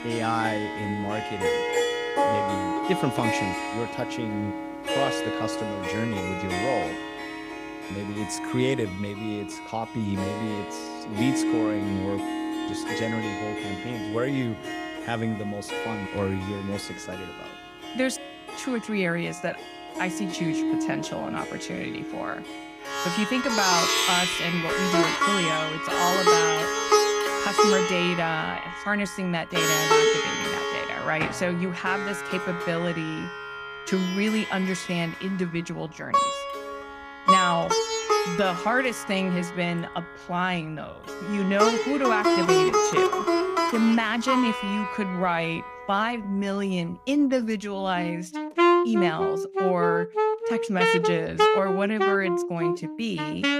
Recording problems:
background music; very loud; throughout; 2 dB above the speech

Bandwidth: 15.5 kHz